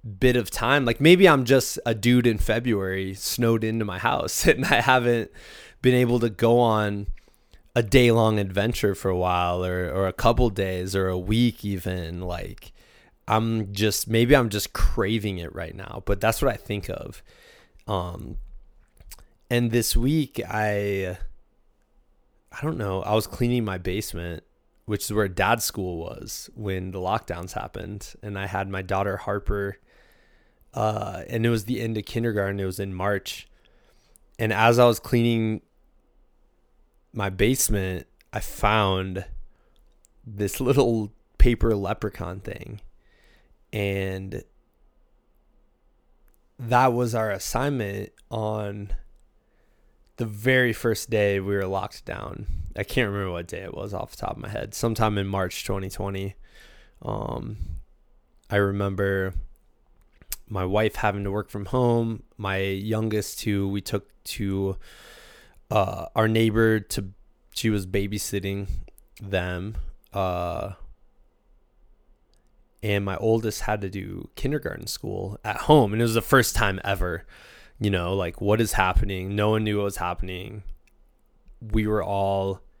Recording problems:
none

